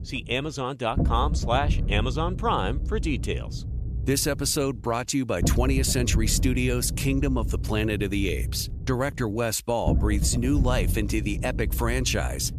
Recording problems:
low rumble; noticeable; throughout; 15 dB below the speech

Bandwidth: 14.5 kHz